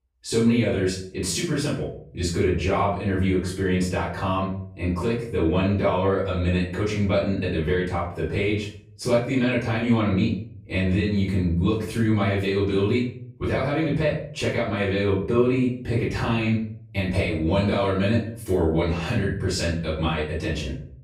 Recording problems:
off-mic speech; far
room echo; noticeable; dies away in 0.5 s

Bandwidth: 15.5 kHz